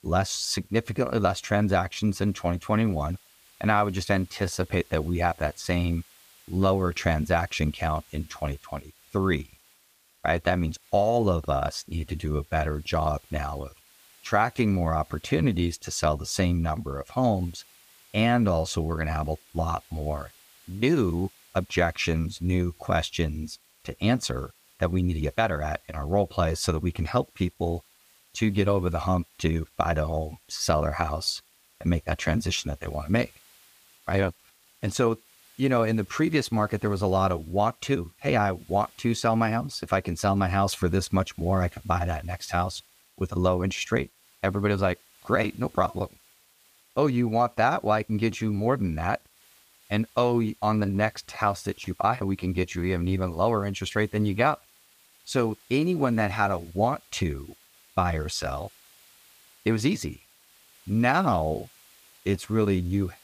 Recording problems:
hiss; faint; throughout; 30 dB below the speech

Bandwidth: 15 kHz